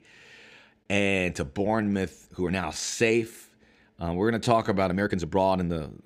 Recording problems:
uneven, jittery; strongly; from 1 s on

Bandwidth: 15.5 kHz